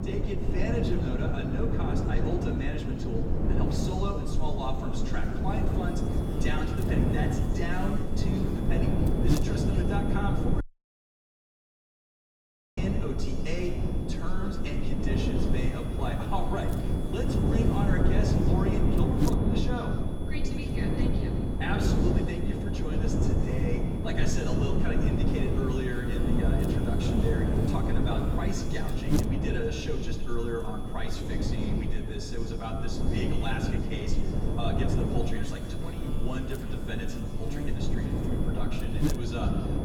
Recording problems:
off-mic speech; far
room echo; slight; dies away in 1.3 s
wind noise on the microphone; heavy; as loud as the speech
electrical hum; loud; throughout; 50 Hz, 9 dB below the speech
high-pitched whine; noticeable; from 6 s on; 3.5 kHz, 20 dB below the speech
audio cutting out; at 11 s for 2 s

